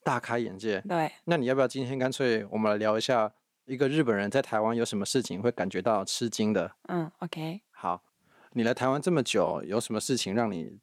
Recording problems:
none

